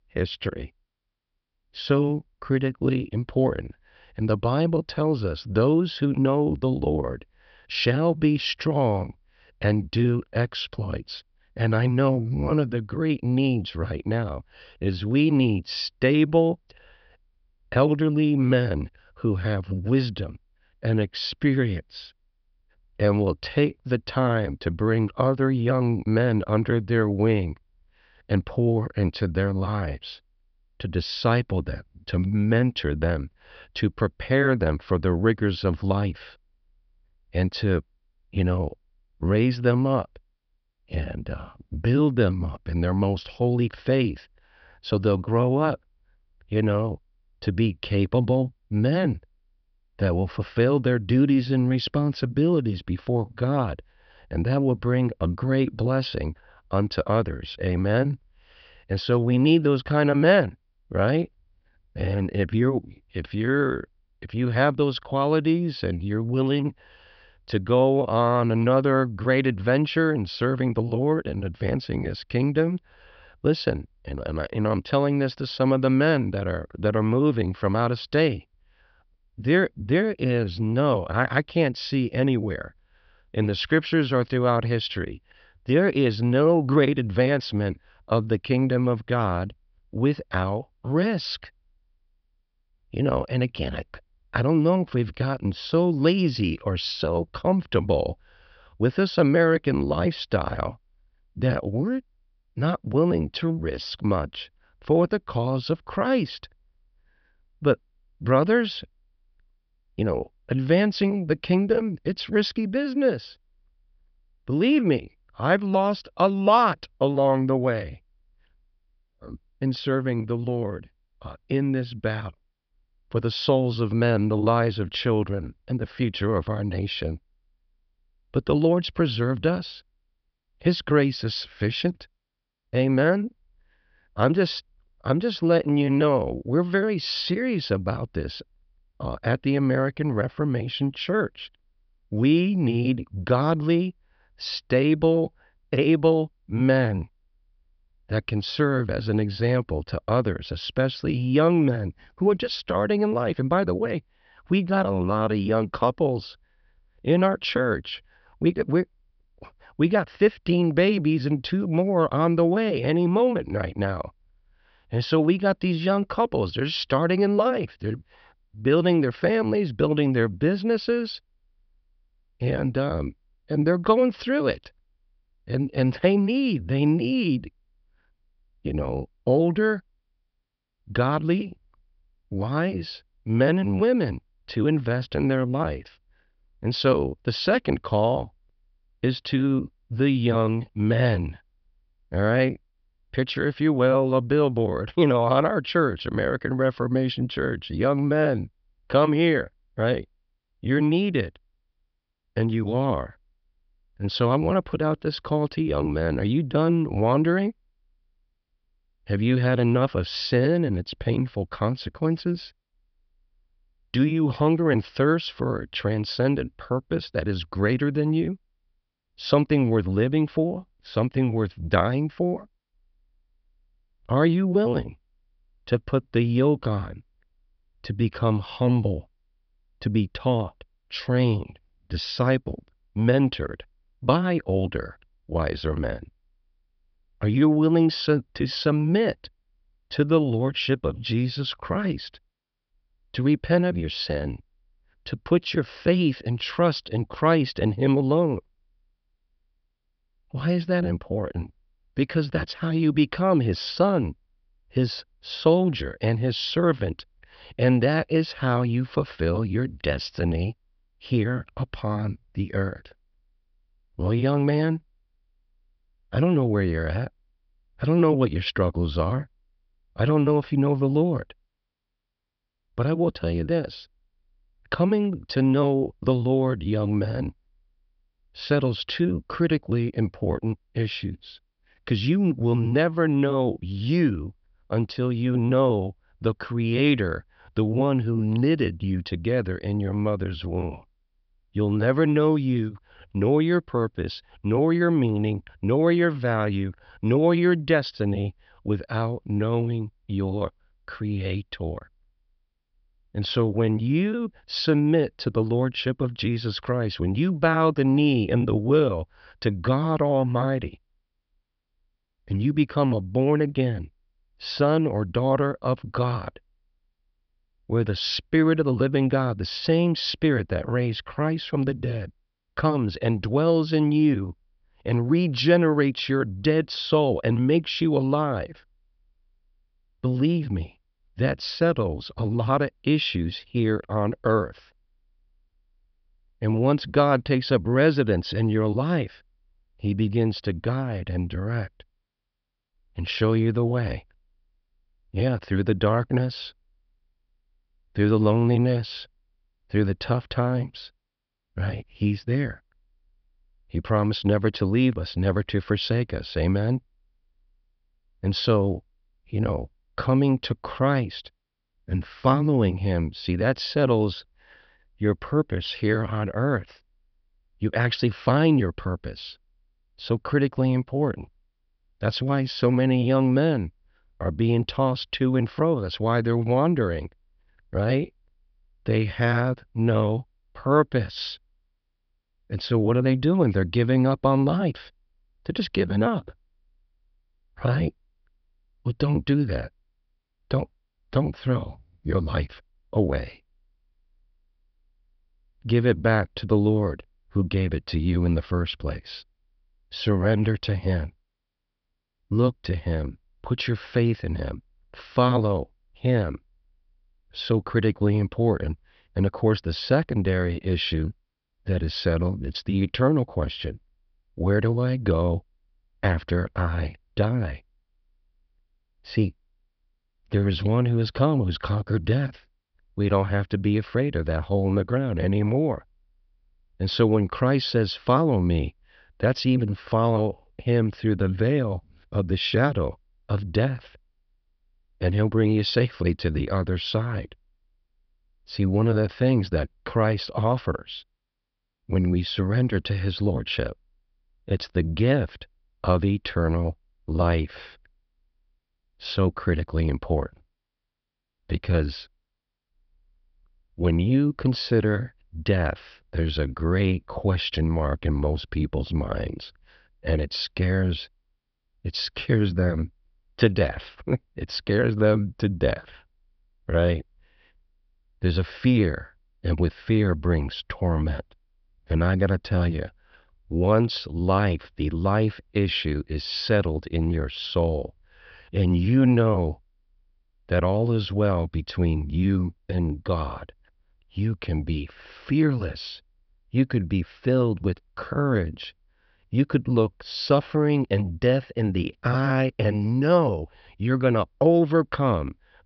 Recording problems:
high frequencies cut off; noticeable; nothing above 5.5 kHz

